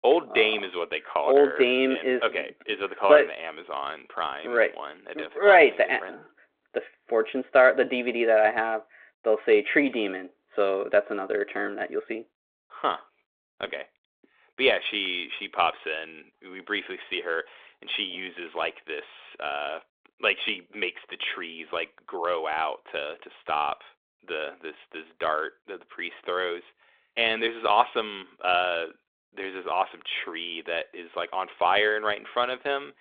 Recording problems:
phone-call audio; nothing above 3.5 kHz

